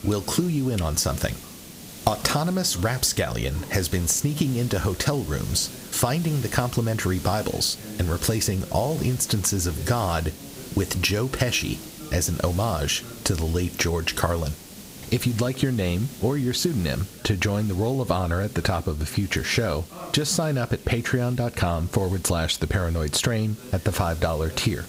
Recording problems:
squashed, flat; somewhat, background pumping
hiss; noticeable; throughout; 15 dB below the speech
voice in the background; faint; throughout; 25 dB below the speech

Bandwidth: 15.5 kHz